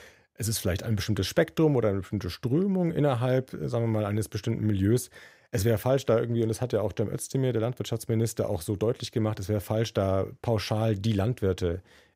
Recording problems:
none

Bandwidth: 15.5 kHz